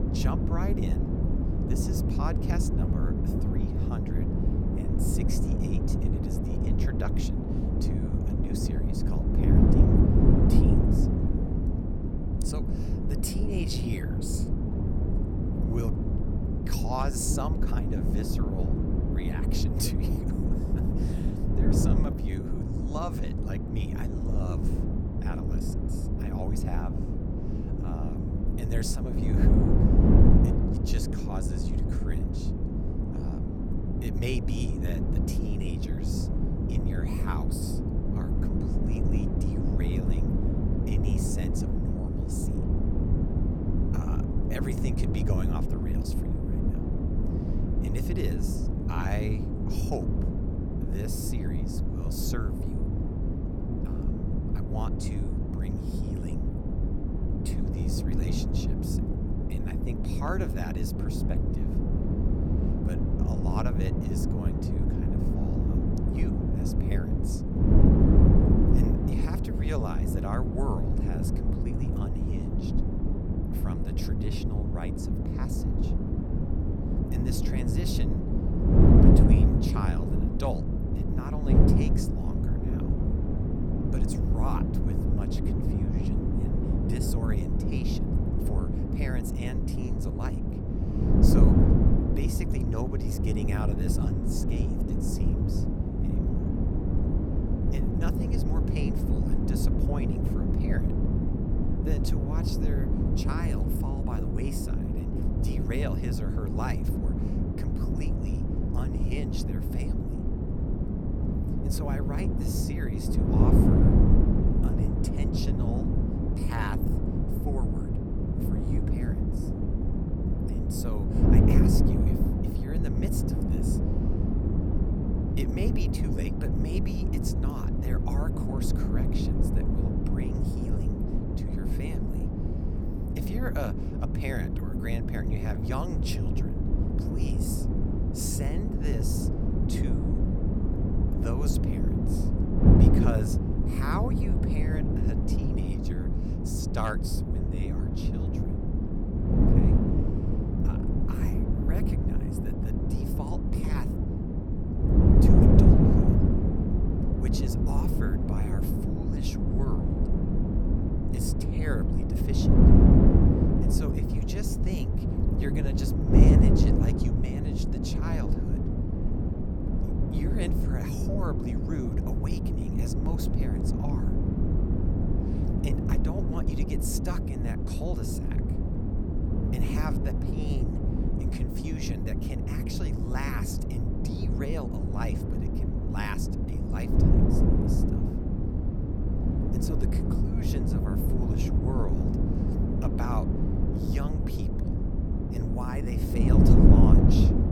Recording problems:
wind noise on the microphone; heavy; 4 dB above the speech

